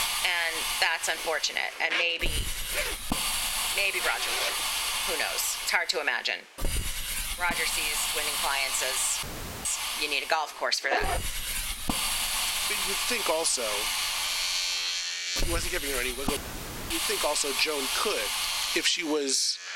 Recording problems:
thin; very; fading below 400 Hz
squashed, flat; somewhat
household noises; loud; throughout; 5 dB below the speech
hiss; loud; throughout; 1 dB below the speech
audio cutting out; at 9 s and at 16 s for 0.5 s

